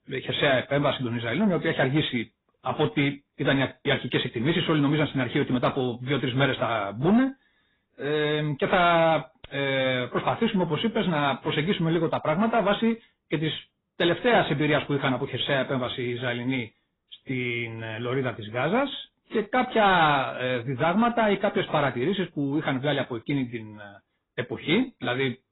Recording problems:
garbled, watery; badly; nothing above 4 kHz
distortion; slight; 10 dB below the speech

